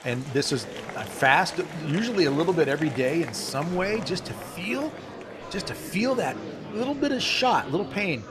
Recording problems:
murmuring crowd; noticeable; throughout; 10 dB below the speech

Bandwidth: 14 kHz